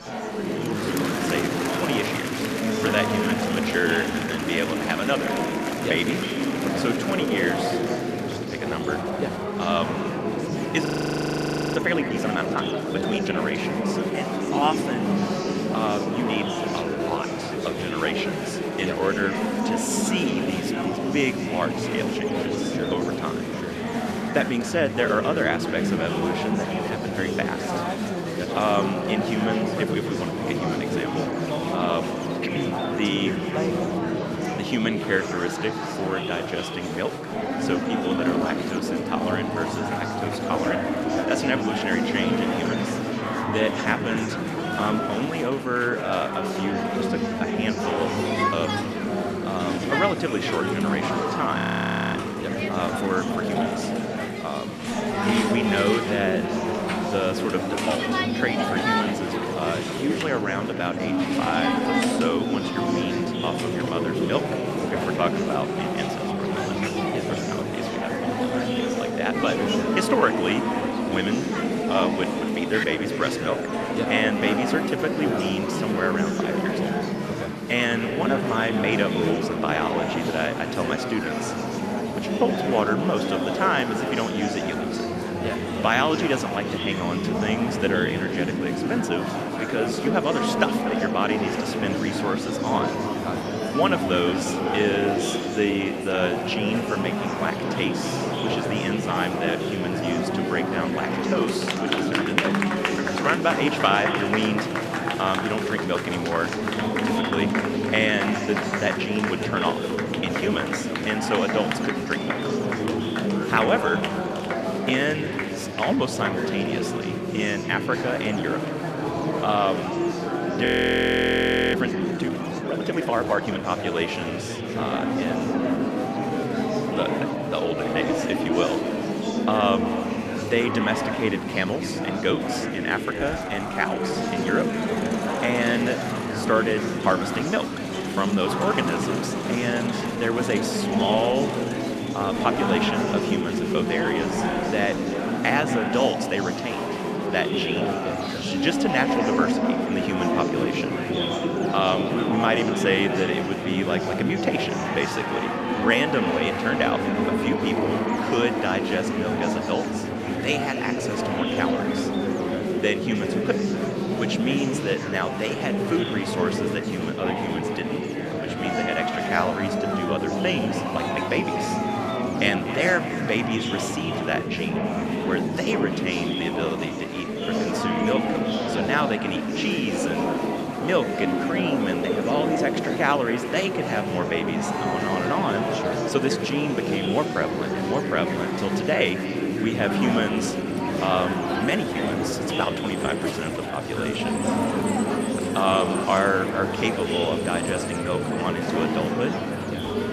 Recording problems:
echo of what is said; noticeable; throughout; 240 ms later, 15 dB below the speech
murmuring crowd; very loud; throughout; 1 dB above the speech
electrical hum; noticeable; throughout; 60 Hz, 20 dB below the speech
train or aircraft noise; faint; throughout; 30 dB below the speech
audio freezing; at 11 s for 1 s, at 52 s for 0.5 s and at 2:01 for 1 s

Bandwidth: 14 kHz